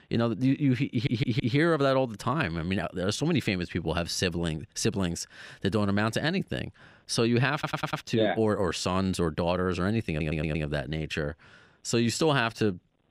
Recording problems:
audio stuttering; at 1 s, at 7.5 s and at 10 s

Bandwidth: 15.5 kHz